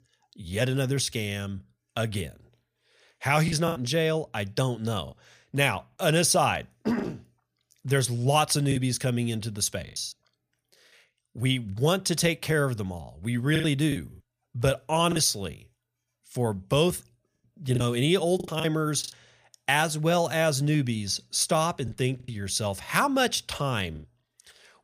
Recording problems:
choppy; very; 5% of the speech affected

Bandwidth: 15 kHz